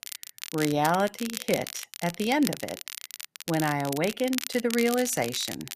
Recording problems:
crackle, like an old record; loud; 9 dB below the speech

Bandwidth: 14.5 kHz